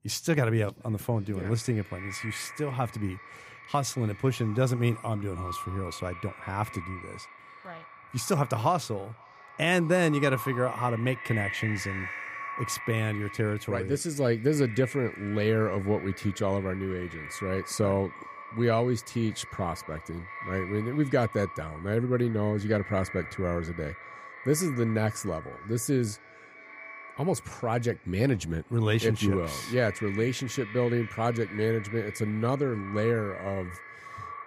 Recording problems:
echo of what is said; noticeable; throughout; 510 ms later, 10 dB below the speech

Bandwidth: 15 kHz